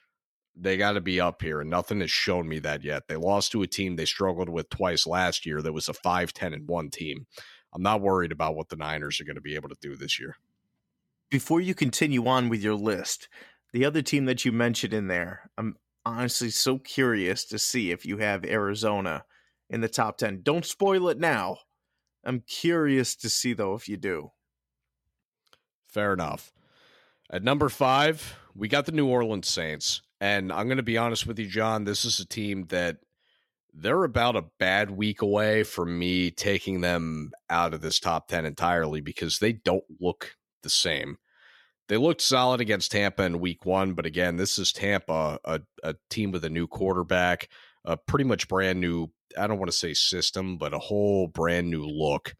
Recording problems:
none

